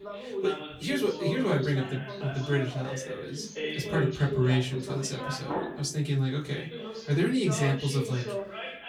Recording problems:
off-mic speech; far
room echo; very slight; dies away in 0.2 s
background chatter; loud; throughout; 2 voices, 7 dB below the speech

